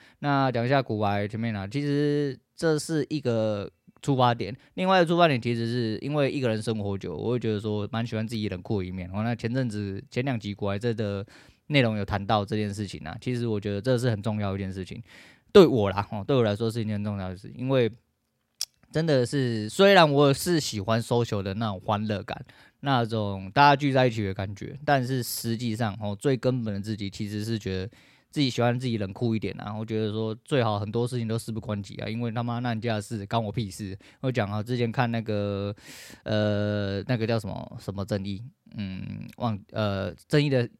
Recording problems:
none

